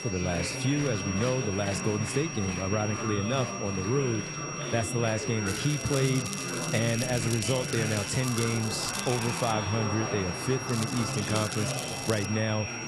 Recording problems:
garbled, watery; slightly; nothing above 11.5 kHz
high-pitched whine; loud; throughout; 5.5 kHz, 7 dB below the speech
chatter from many people; loud; throughout; 5 dB below the speech
crackling; loud; from 5.5 to 9.5 s and from 11 to 12 s; 8 dB below the speech

